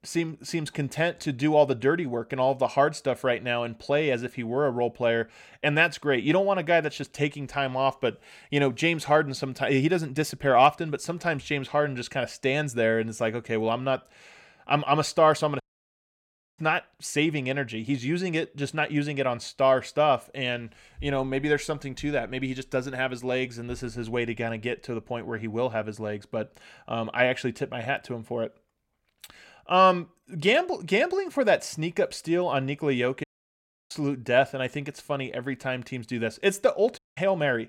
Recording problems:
audio cutting out; at 16 s for 1 s, at 33 s for 0.5 s and at 37 s

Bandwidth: 16.5 kHz